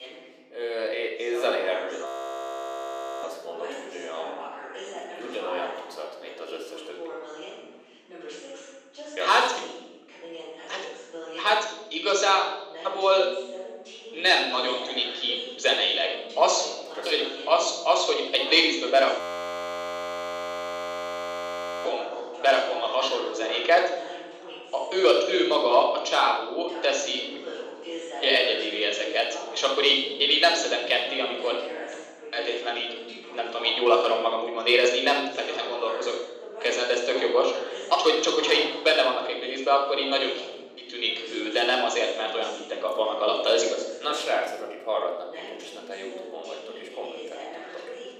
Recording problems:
thin; very; fading below 350 Hz
room echo; noticeable; dies away in 1.3 s
off-mic speech; somewhat distant
voice in the background; noticeable; throughout; 15 dB below the speech
audio freezing; at 2 s for 1 s and at 19 s for 2.5 s

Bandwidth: 15 kHz